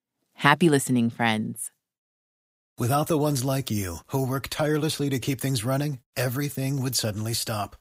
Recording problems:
none

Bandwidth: 15.5 kHz